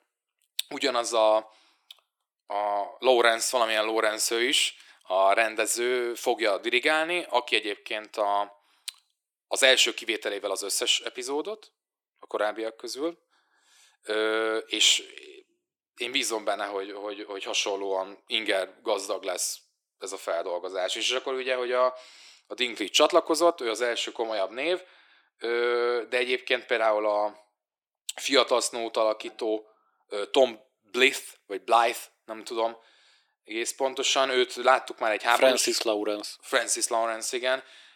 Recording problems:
thin; very; fading below 350 Hz

